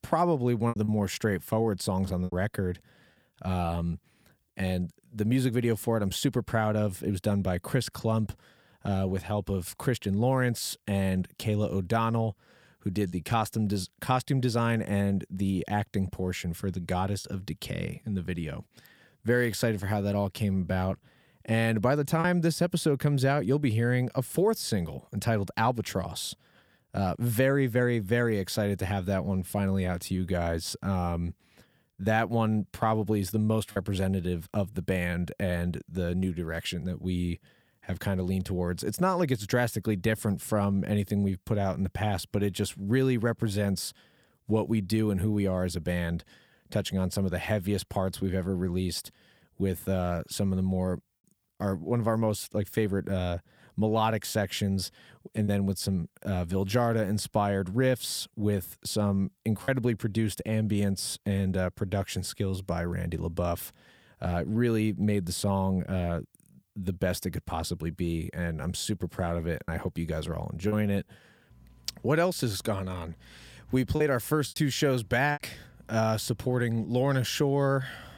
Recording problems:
choppy; occasionally; 1% of the speech affected

